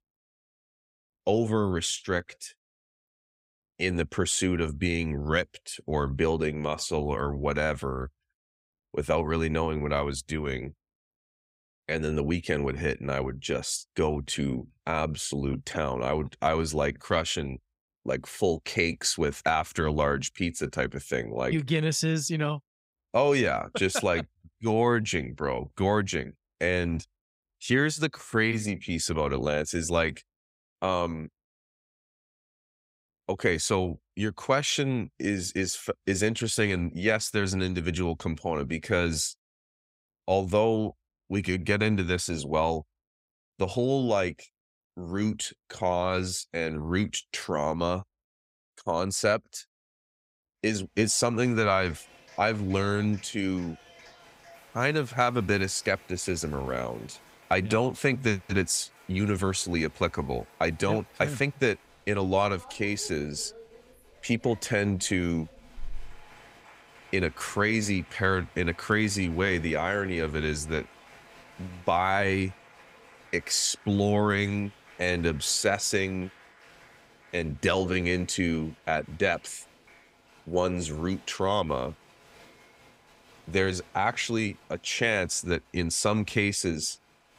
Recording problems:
crowd noise; faint; from 51 s on; 25 dB below the speech

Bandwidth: 15.5 kHz